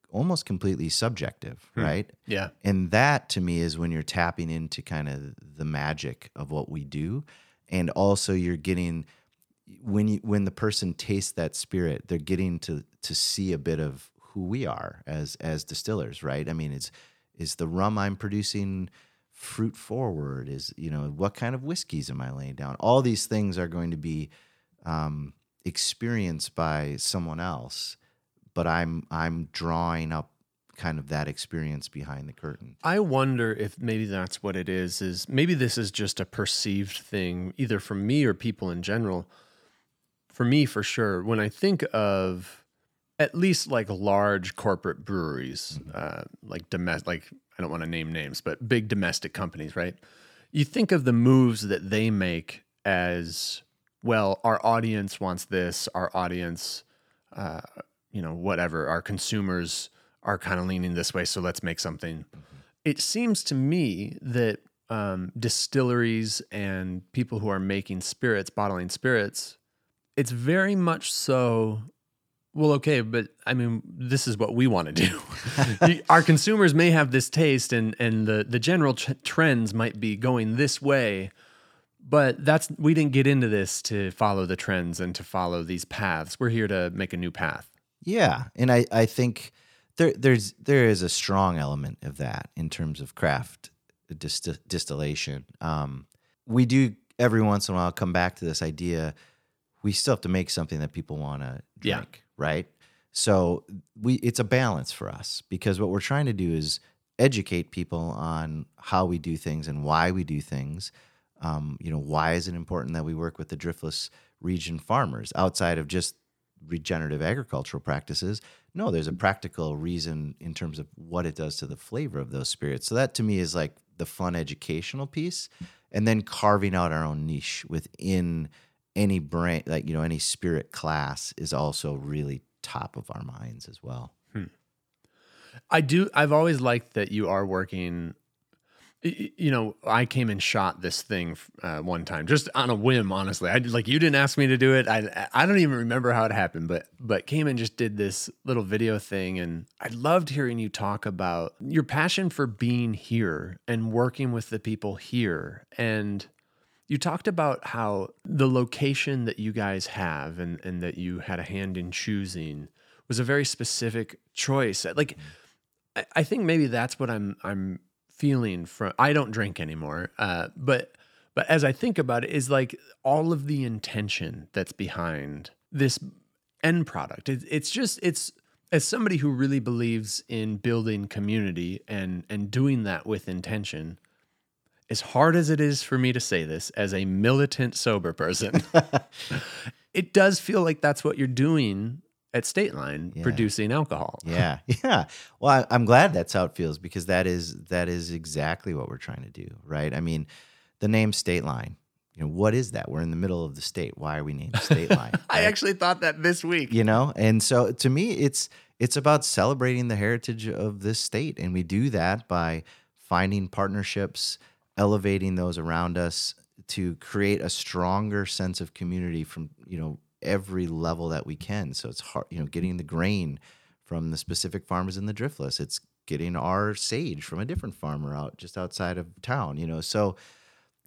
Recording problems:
none

